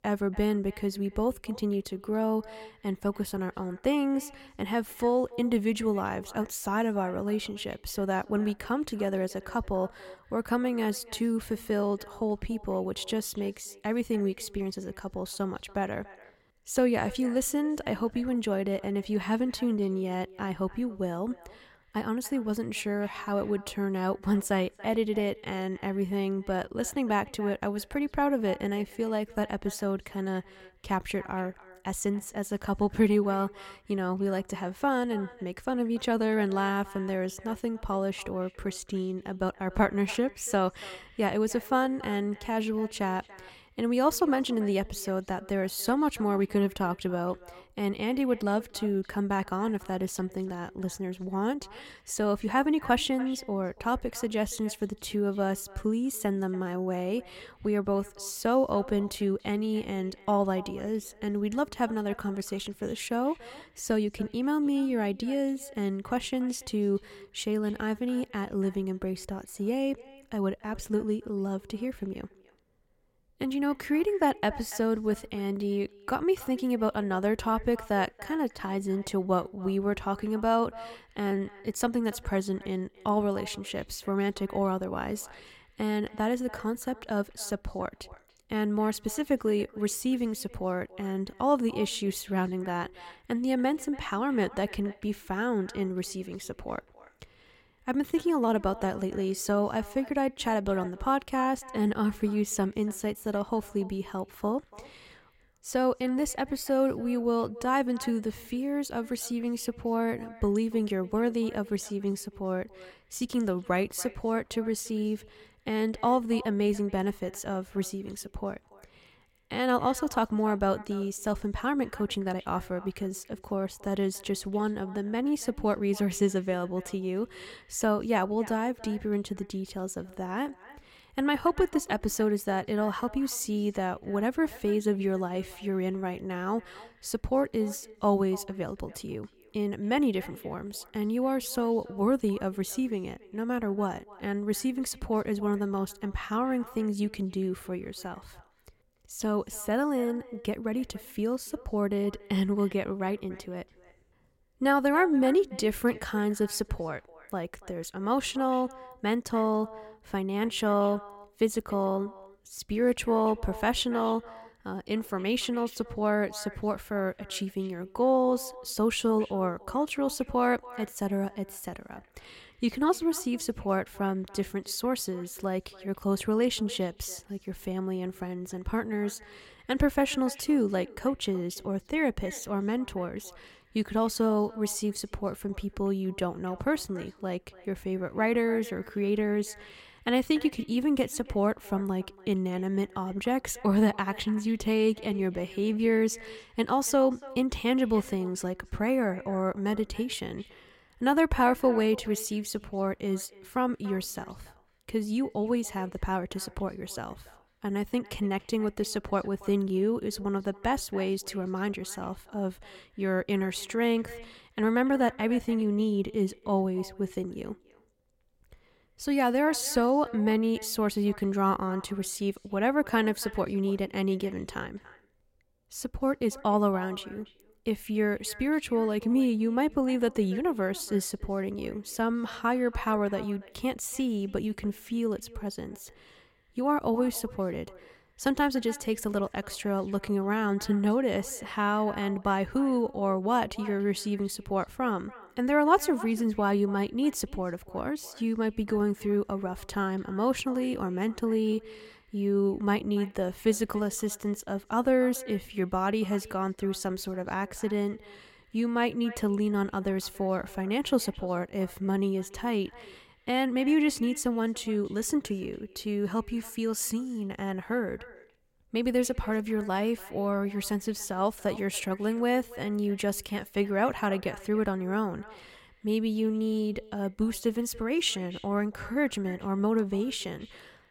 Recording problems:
echo of what is said; faint; throughout; 290 ms later, 20 dB below the speech

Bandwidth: 16.5 kHz